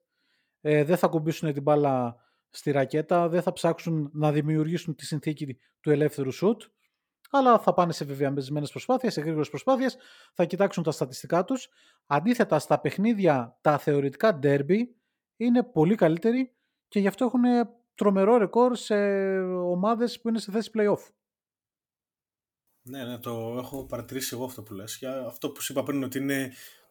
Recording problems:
none

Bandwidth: 18.5 kHz